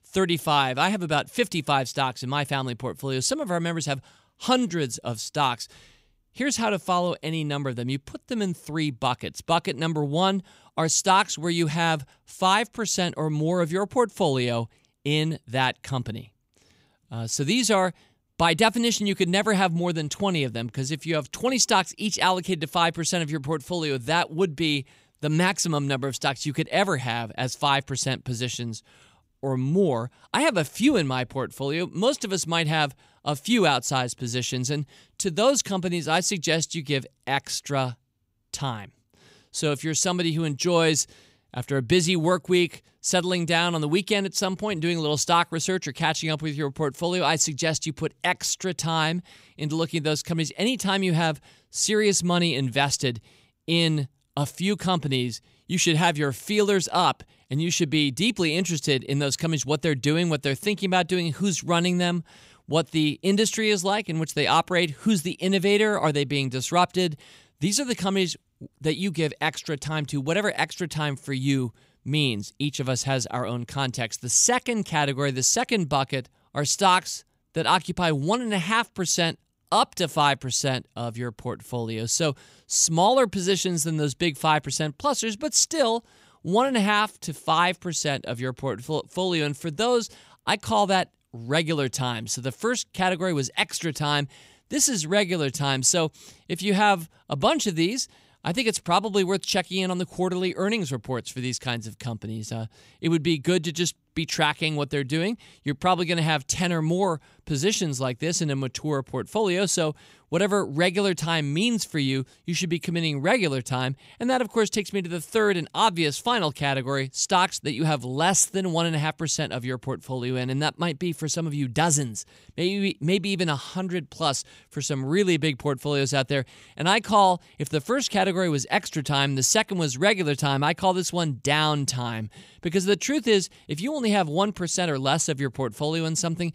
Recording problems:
none

